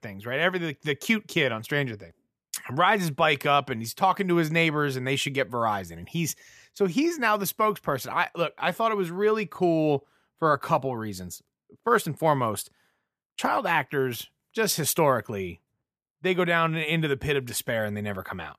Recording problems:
none

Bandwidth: 14.5 kHz